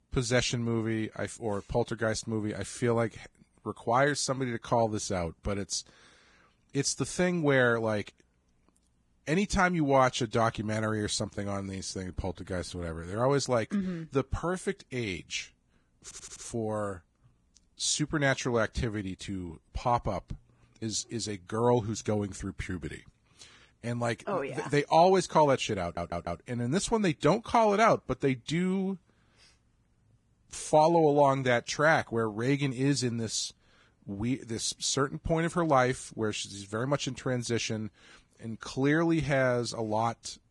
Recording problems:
garbled, watery; badly
audio stuttering; at 16 s and at 26 s

